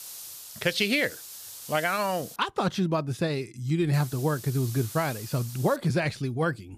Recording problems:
hiss; noticeable; until 2.5 s and from 4 to 6 s; 15 dB below the speech

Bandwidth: 14.5 kHz